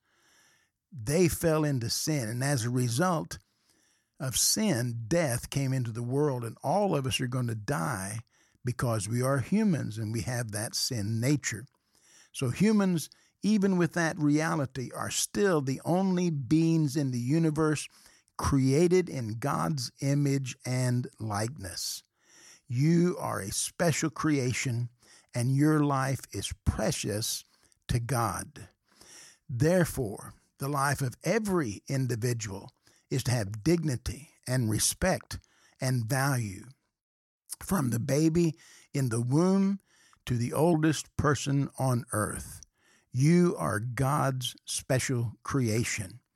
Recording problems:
uneven, jittery; slightly; from 20 to 45 s

